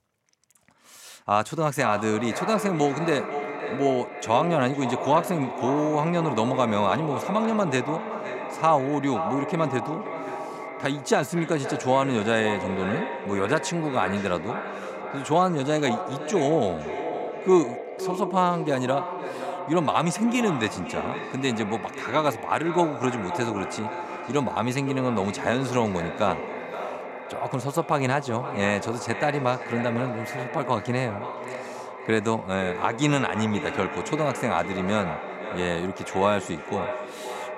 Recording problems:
echo of what is said; strong; throughout; 520 ms later, 7 dB below the speech

